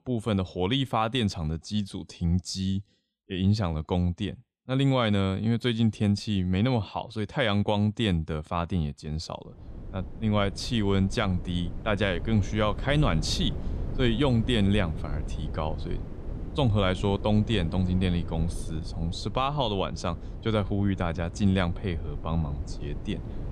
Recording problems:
wind noise on the microphone; occasional gusts; from 9.5 s on; 15 dB below the speech

